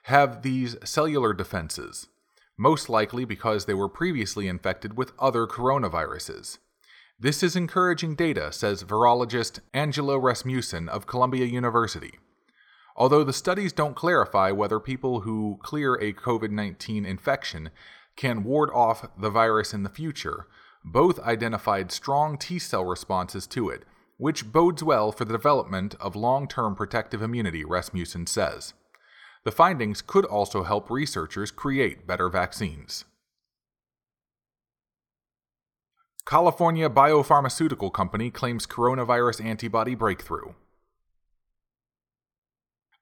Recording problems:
none

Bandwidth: 18 kHz